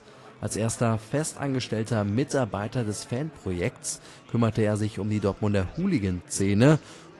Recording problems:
garbled, watery; slightly; nothing above 11 kHz
murmuring crowd; faint; throughout; 25 dB below the speech

